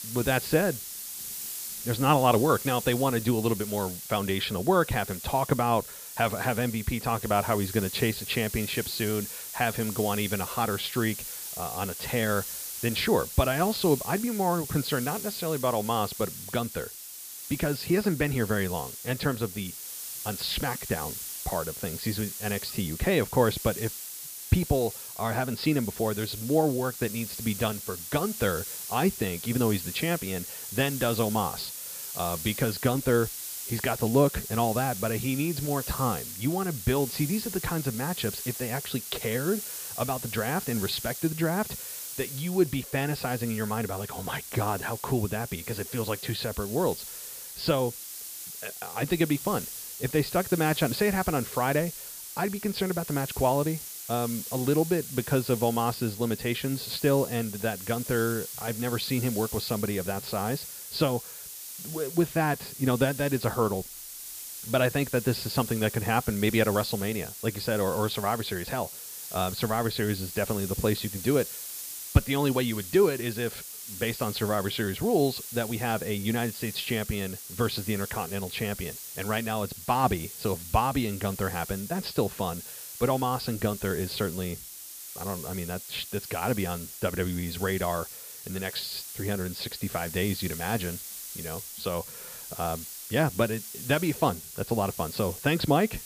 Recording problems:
high frequencies cut off; noticeable; nothing above 5 kHz
hiss; loud; throughout; 8 dB below the speech

